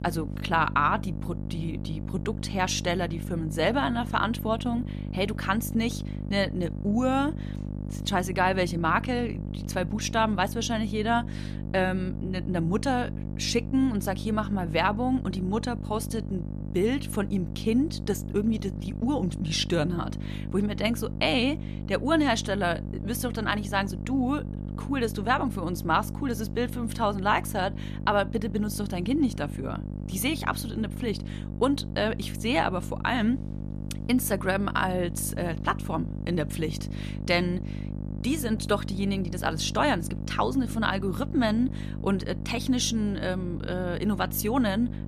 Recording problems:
electrical hum; noticeable; throughout; 50 Hz, 15 dB below the speech

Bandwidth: 14 kHz